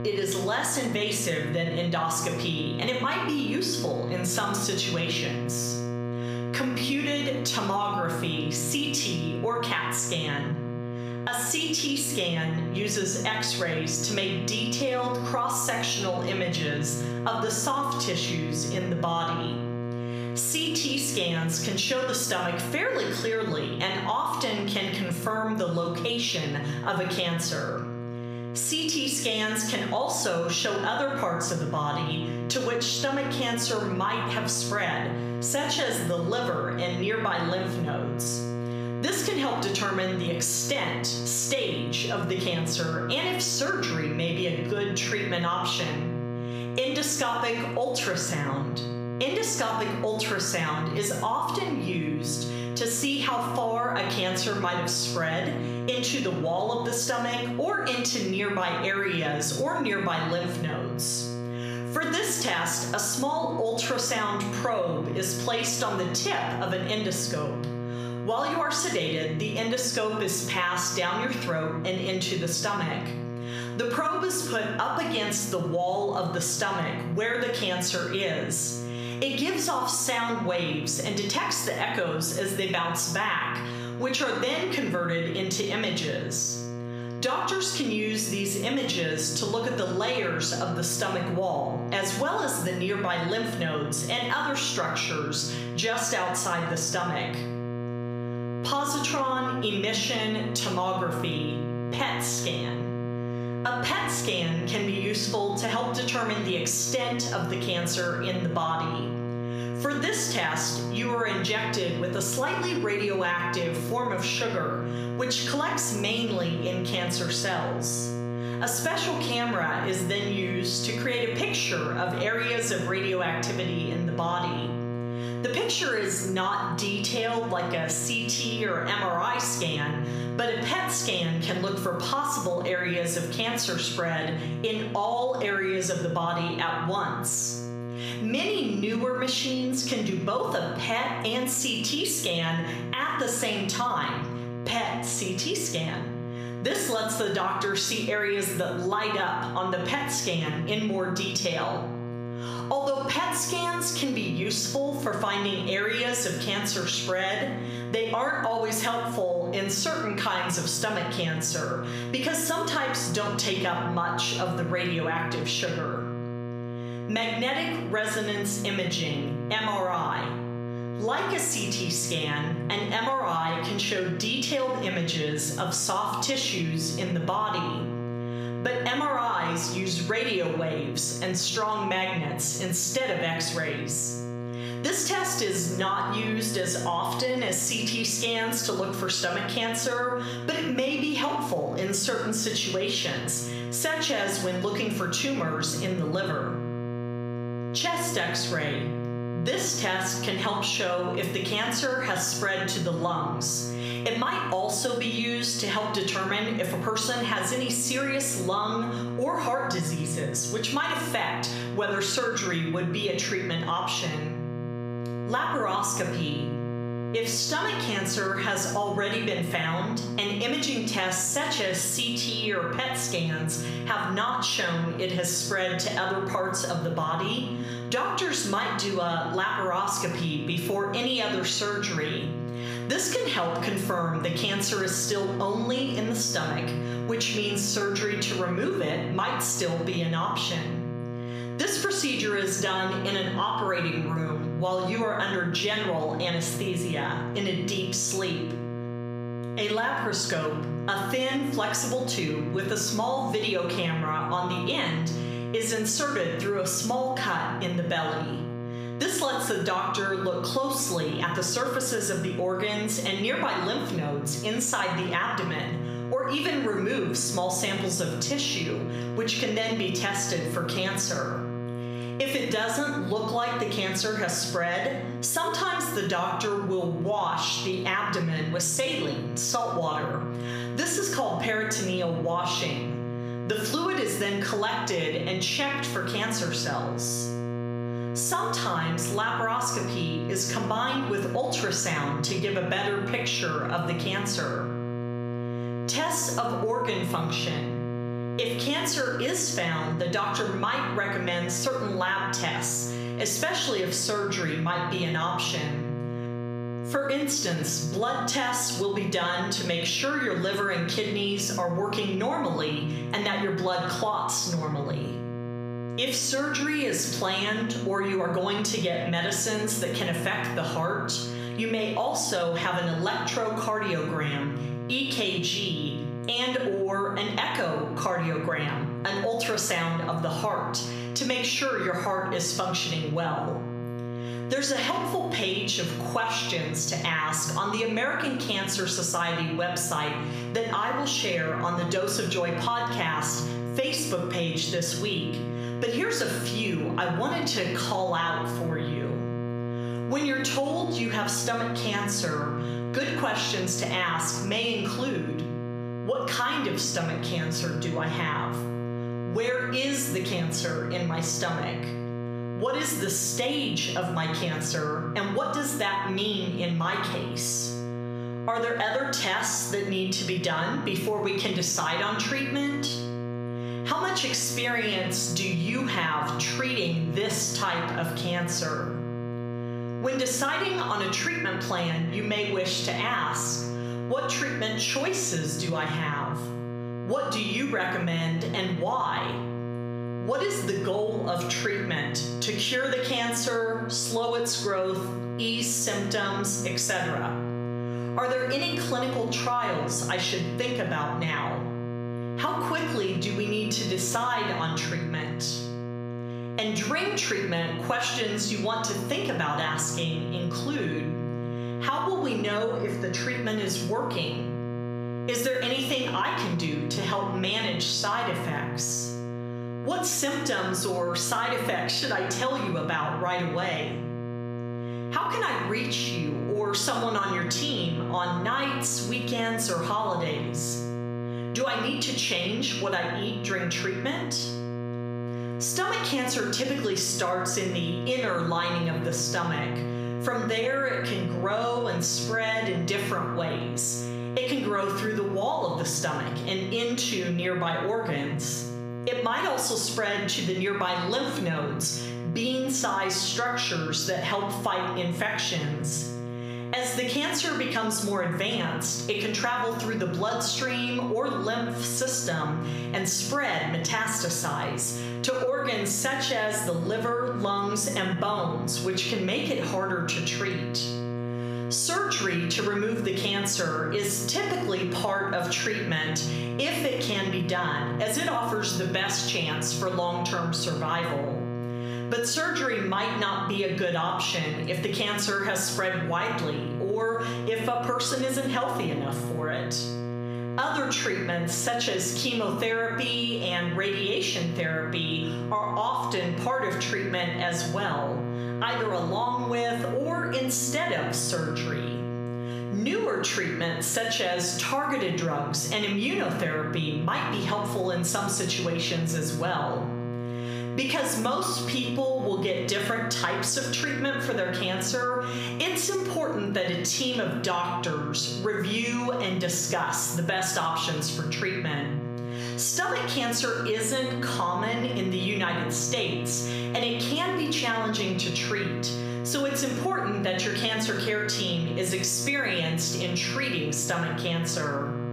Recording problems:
room echo; slight; dies away in 0.6 s
off-mic speech; somewhat distant
squashed, flat; somewhat
electrical hum; noticeable; throughout; 60 Hz, 15 dB below the speech

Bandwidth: 15 kHz